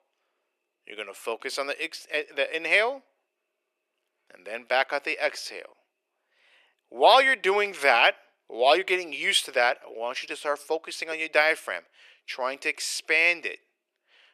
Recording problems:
thin; very; fading below 400 Hz

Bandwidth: 13.5 kHz